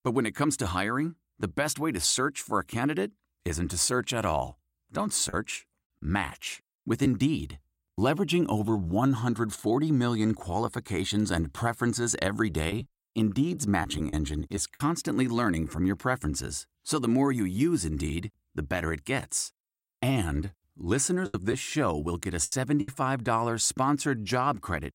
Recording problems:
choppy; very; from 13 to 15 s and from 21 to 23 s; 8% of the speech affected

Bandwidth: 16 kHz